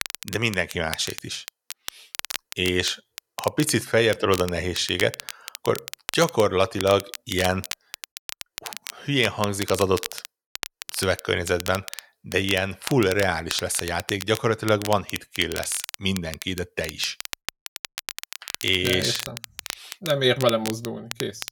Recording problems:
crackle, like an old record; noticeable; 10 dB below the speech

